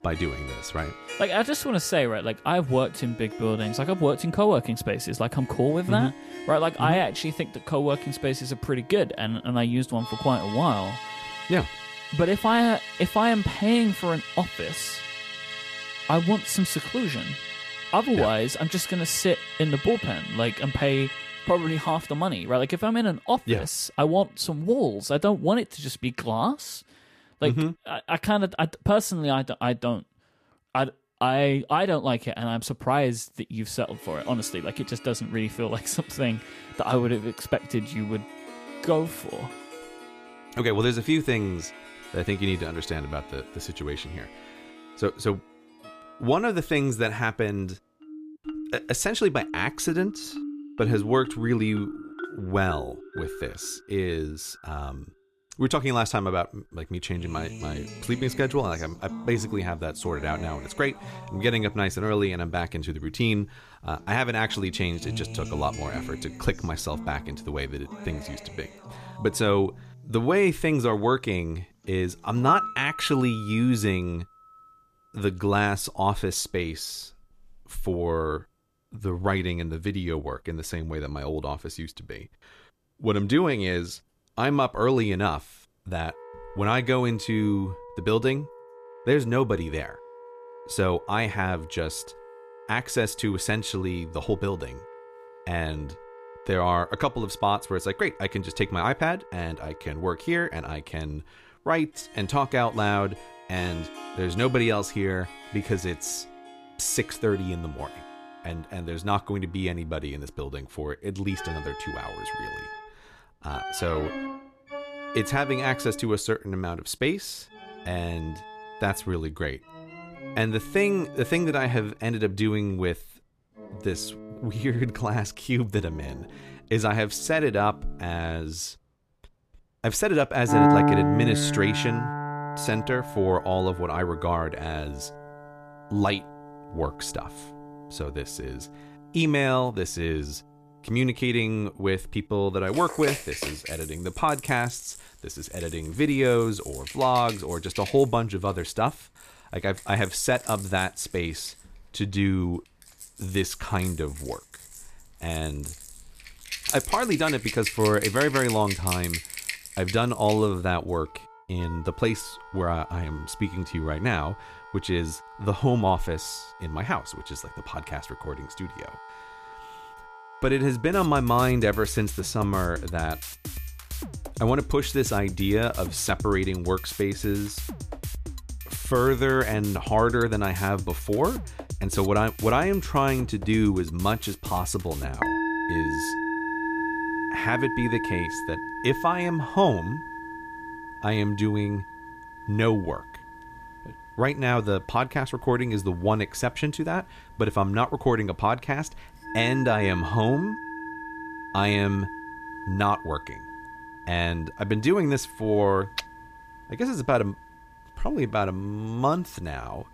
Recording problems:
background music; loud; throughout; 9 dB below the speech

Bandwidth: 14.5 kHz